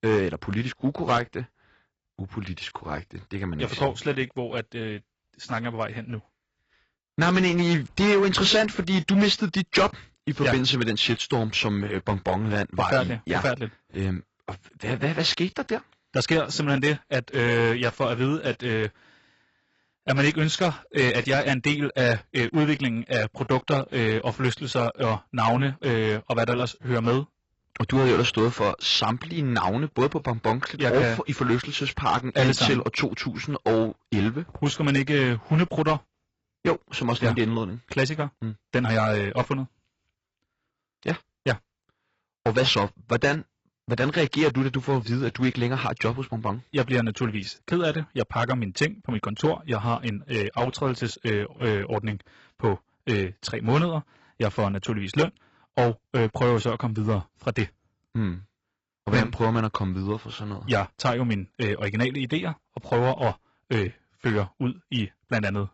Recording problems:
garbled, watery; badly; nothing above 8 kHz
distortion; slight; 4% of the sound clipped

